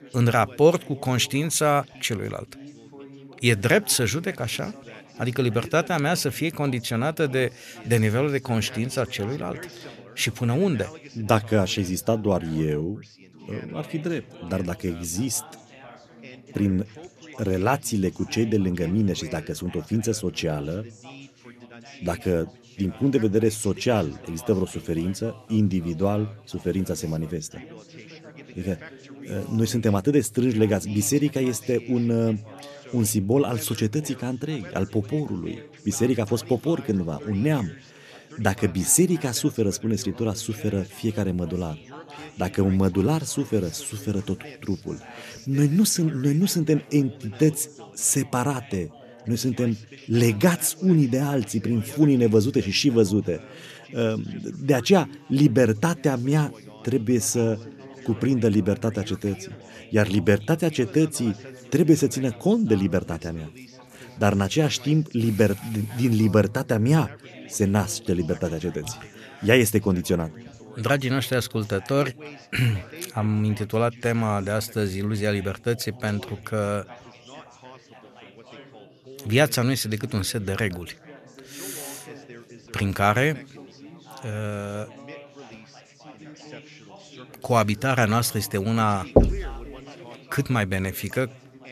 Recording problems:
background chatter; faint; throughout; 4 voices, 20 dB below the speech
door banging; loud; at 1:29; peak 4 dB above the speech

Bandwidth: 14 kHz